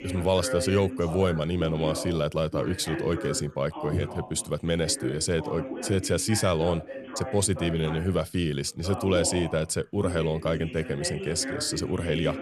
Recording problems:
background chatter; loud; throughout; 2 voices, 9 dB below the speech

